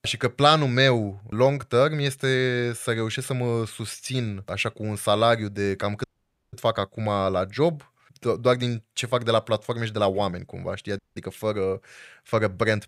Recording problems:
audio cutting out; at 6 s and at 11 s

